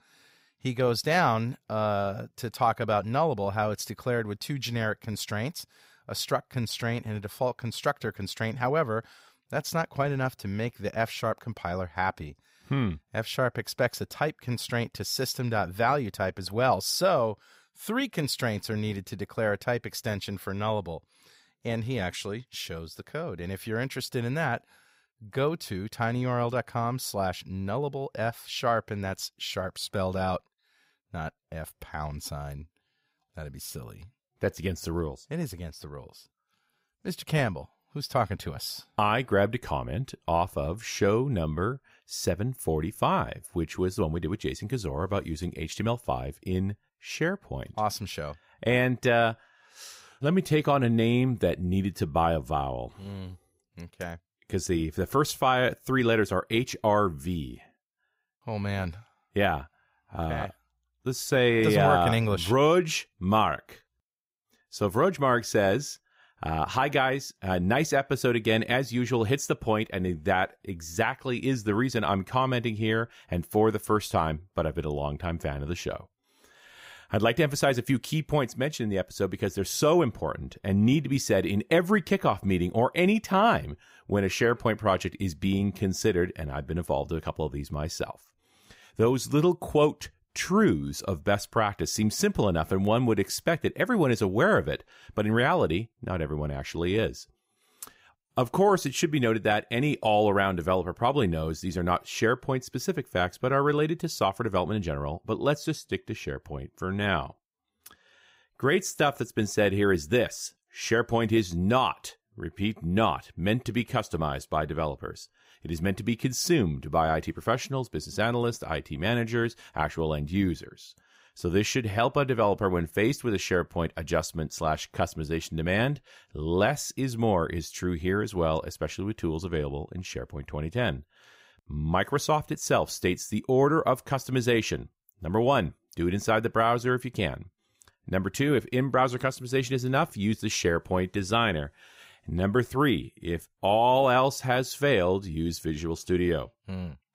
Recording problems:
none

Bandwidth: 15.5 kHz